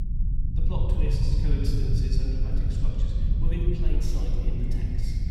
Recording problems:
off-mic speech; far
room echo; noticeable; dies away in 2.6 s
echo of what is said; faint; from 4 s on; 350 ms later, 20 dB below the speech
low rumble; loud; throughout; 3 dB below the speech

